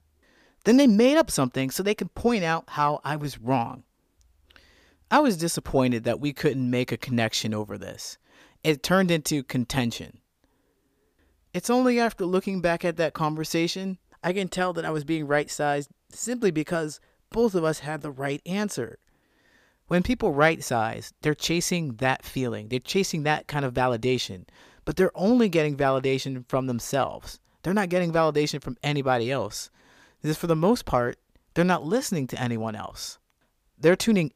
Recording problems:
none

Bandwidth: 15 kHz